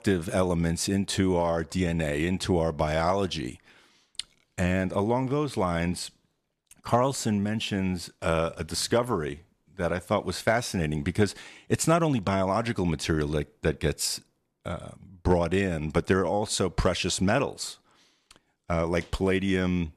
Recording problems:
none

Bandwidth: 13.5 kHz